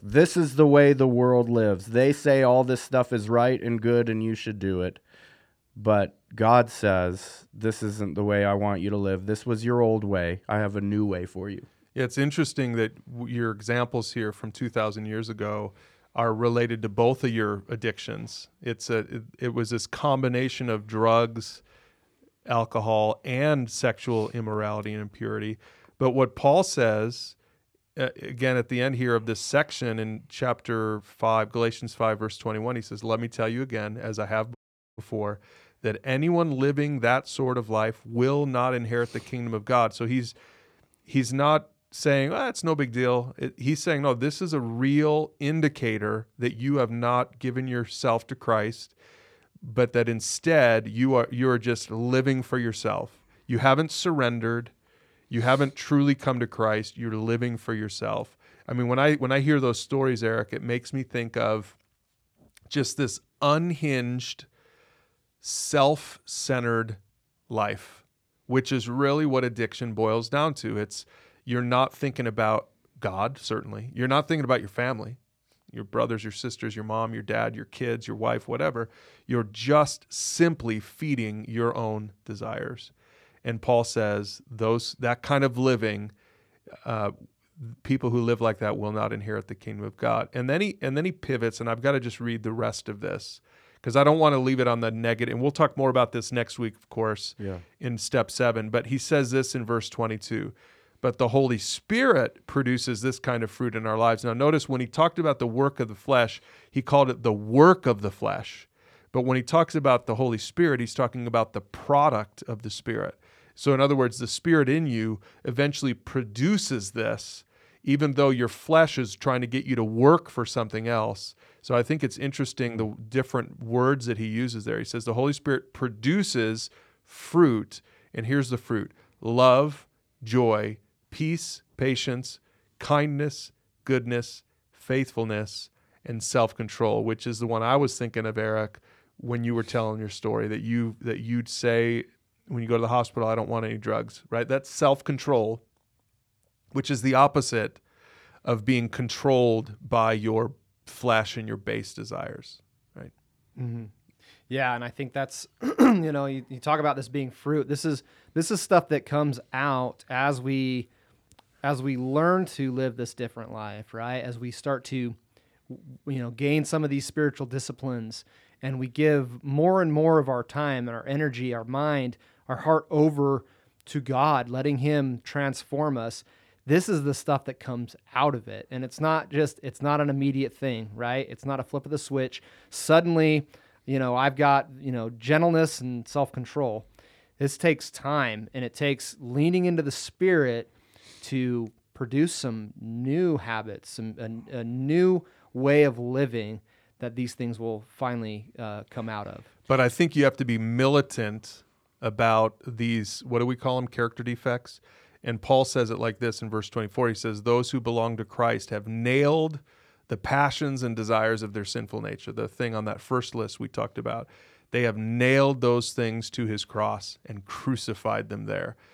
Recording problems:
audio cutting out; at 35 s

